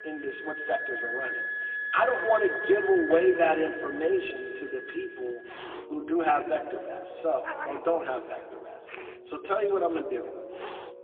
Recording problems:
phone-call audio; poor line; nothing above 3.5 kHz
room echo; slight; dies away in 1.9 s
off-mic speech; somewhat distant
background music; loud; throughout; 7 dB below the speech
animal sounds; noticeable; throughout; 15 dB below the speech

